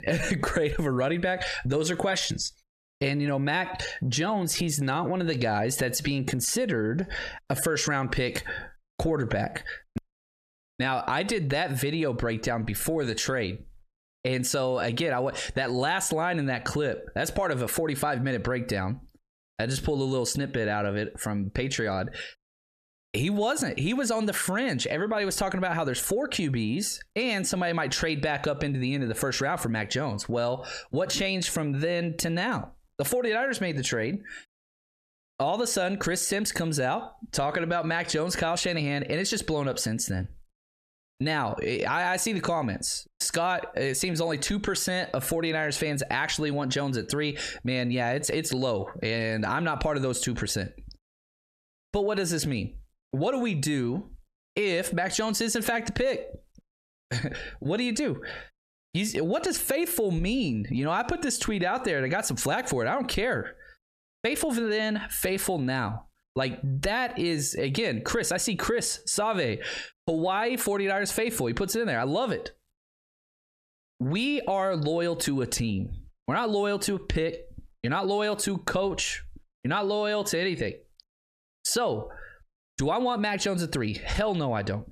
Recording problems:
squashed, flat; heavily

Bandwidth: 14 kHz